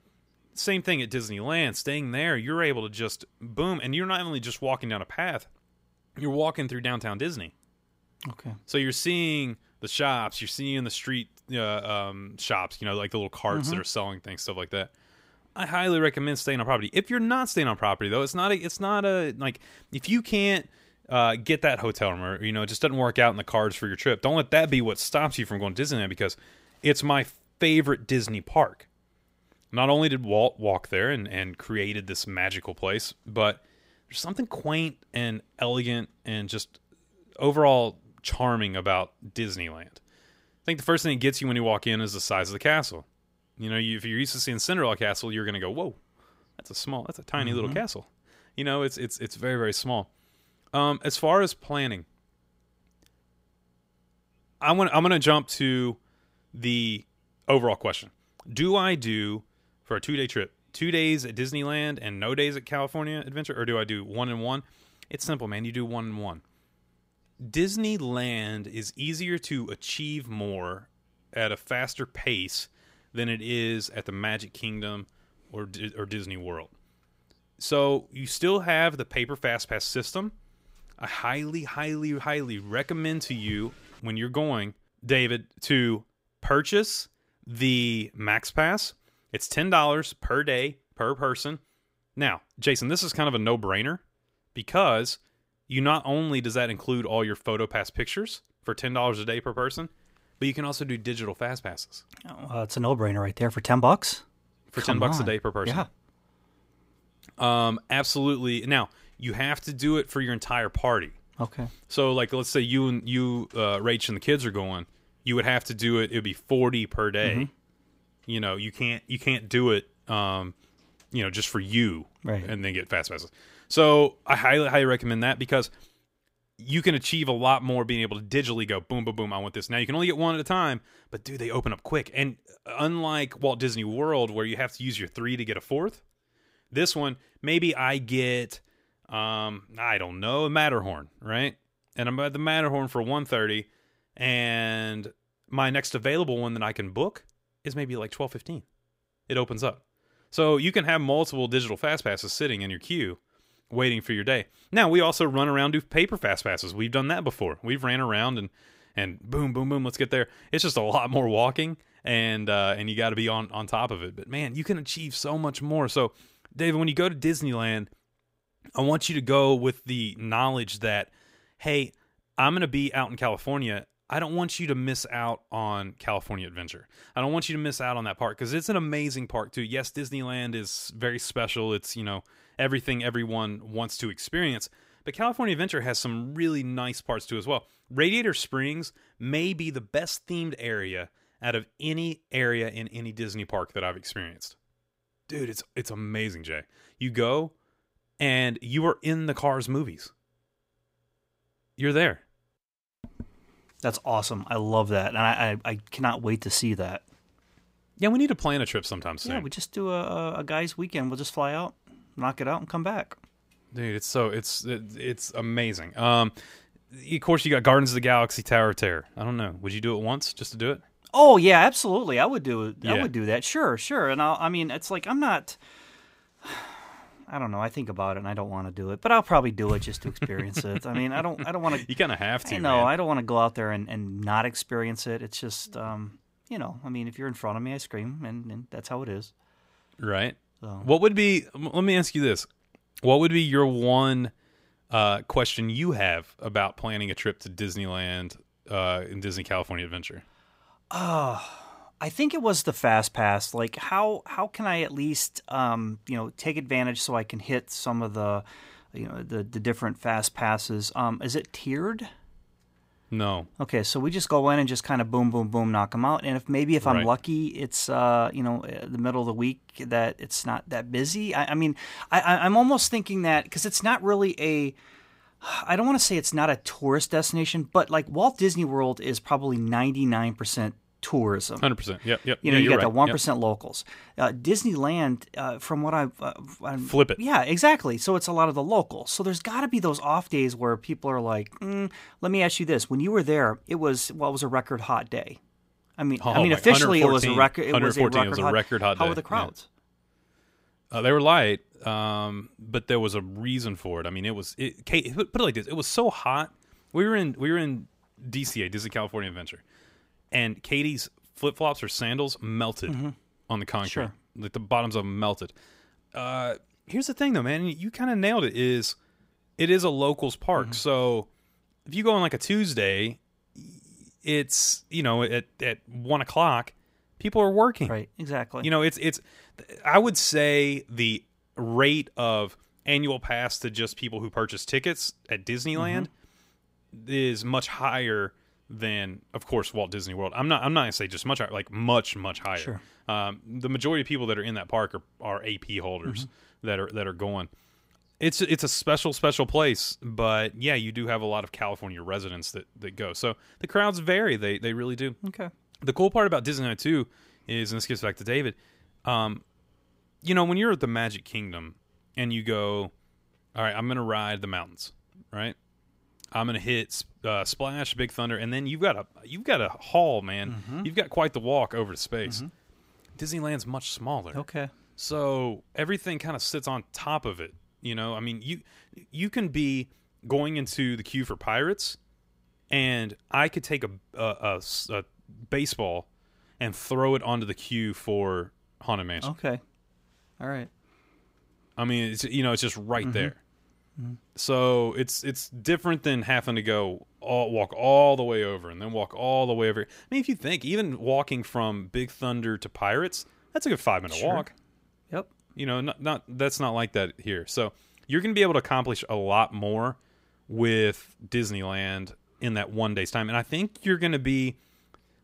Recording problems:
none

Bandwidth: 15.5 kHz